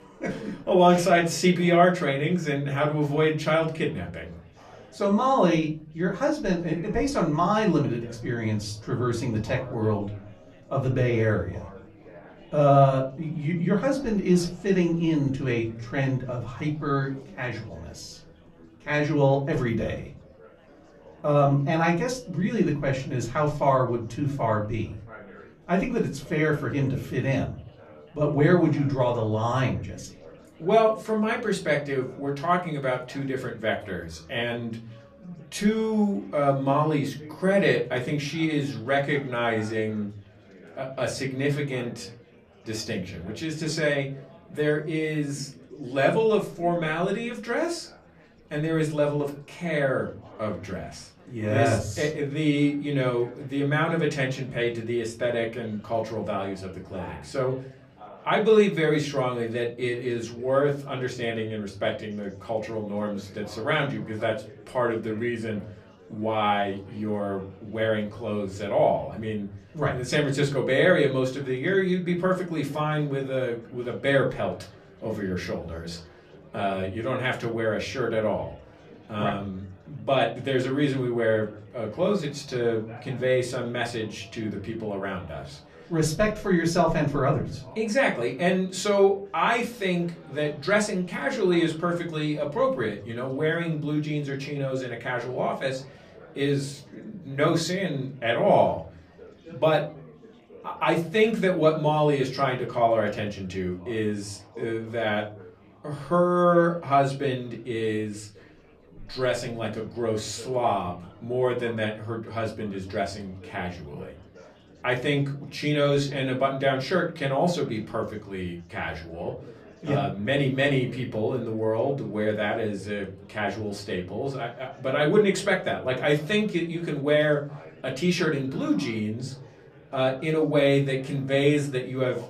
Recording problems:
off-mic speech; far
room echo; very slight; dies away in 0.5 s
chatter from many people; faint; throughout; 25 dB below the speech

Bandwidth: 14.5 kHz